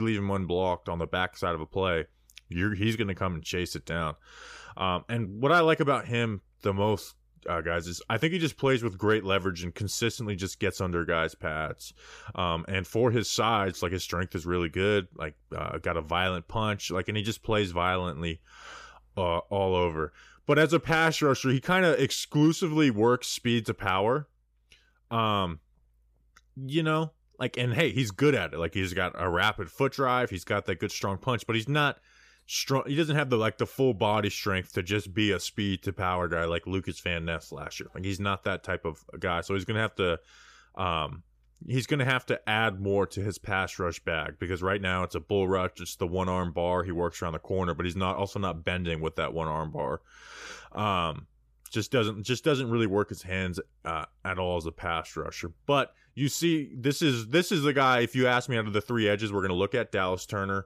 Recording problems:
abrupt cut into speech; at the start

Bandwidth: 15 kHz